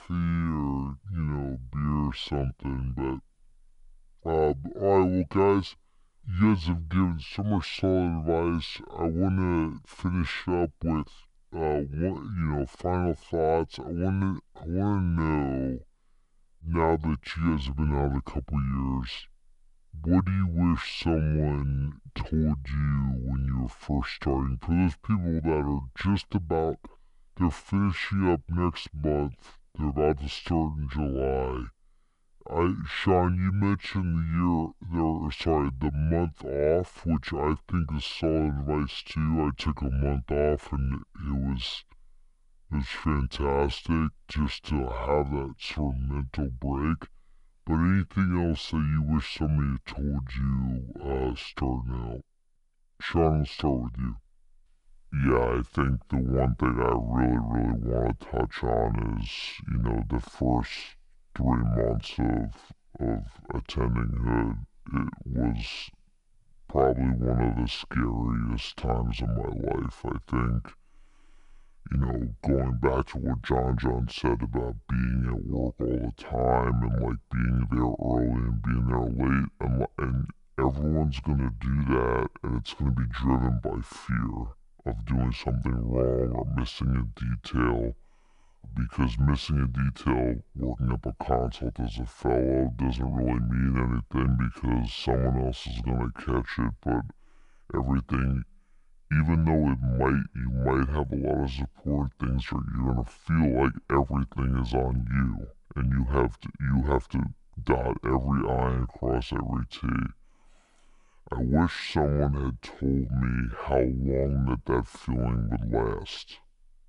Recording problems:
wrong speed and pitch; too slow and too low; 0.6 times normal speed

